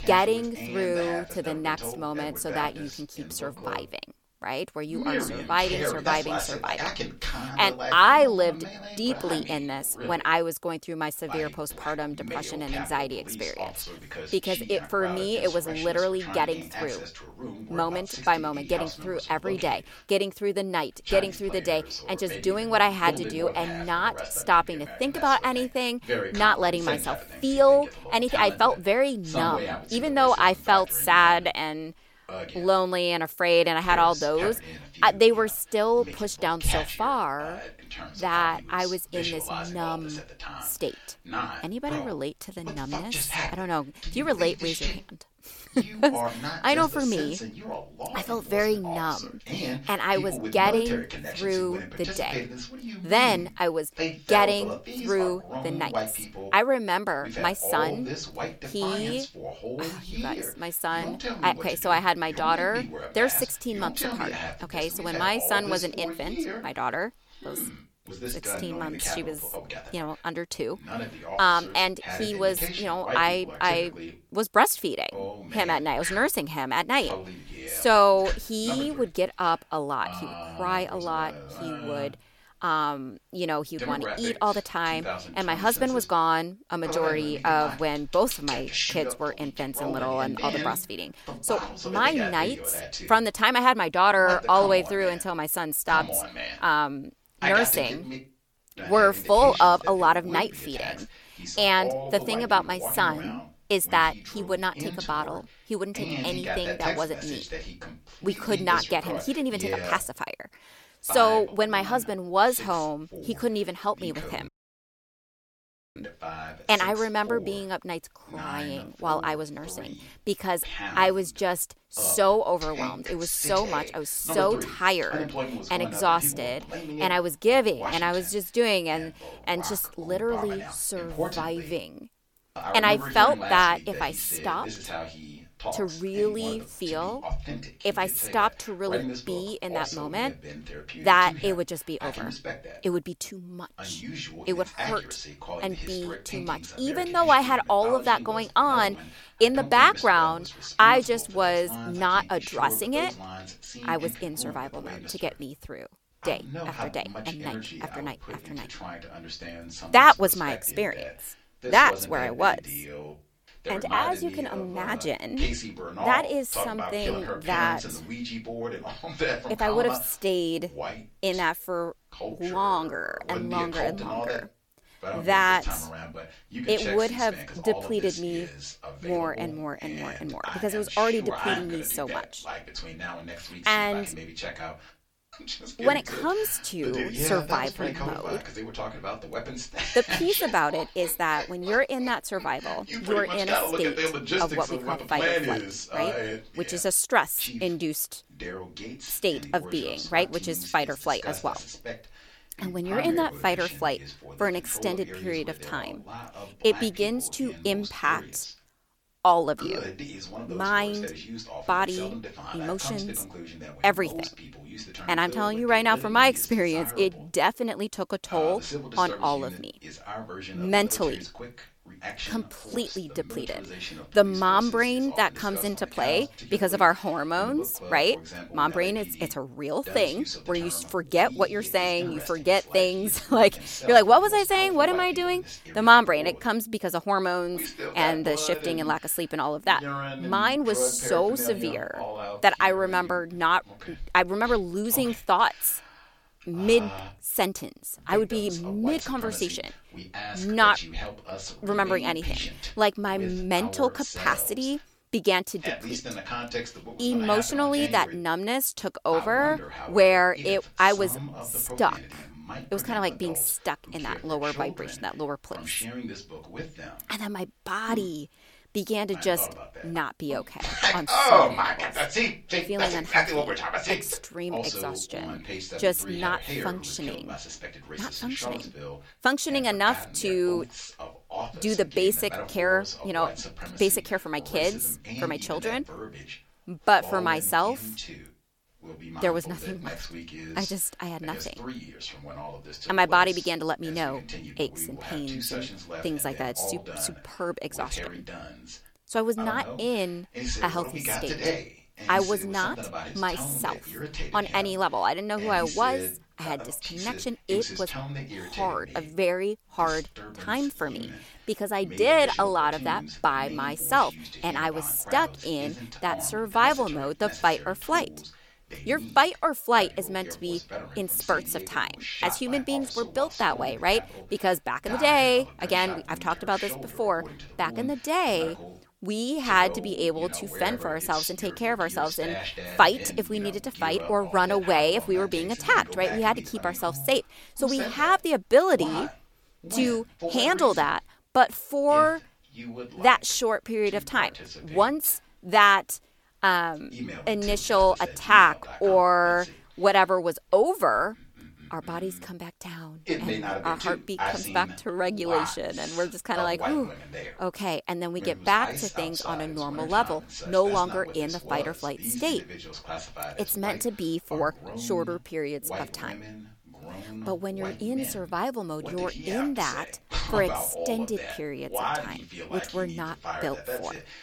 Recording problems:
voice in the background; loud; throughout; 10 dB below the speech
audio cutting out; at 1:54 for 1.5 s

